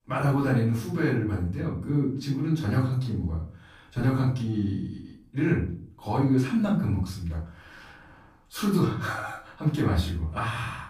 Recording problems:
off-mic speech; far
room echo; noticeable; dies away in 0.4 s

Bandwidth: 15 kHz